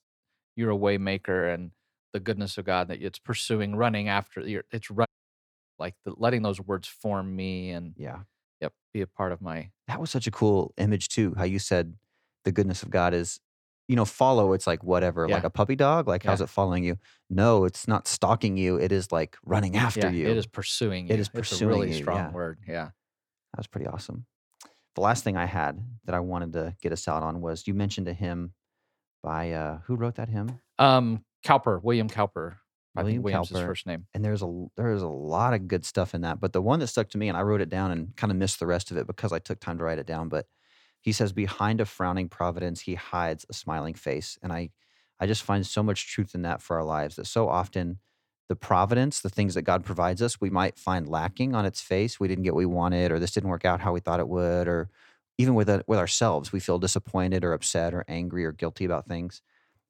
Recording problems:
audio cutting out; at 5 s for 0.5 s

